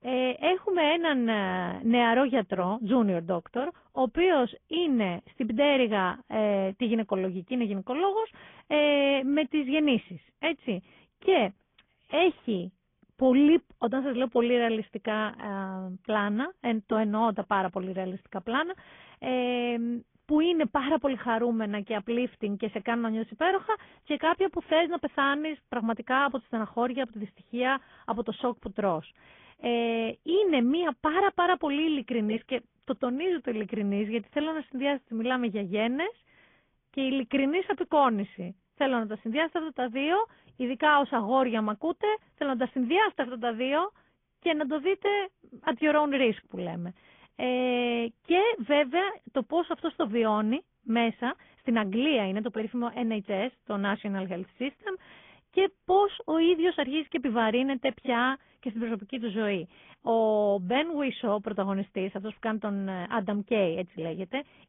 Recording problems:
high frequencies cut off; severe; nothing above 3.5 kHz
garbled, watery; slightly

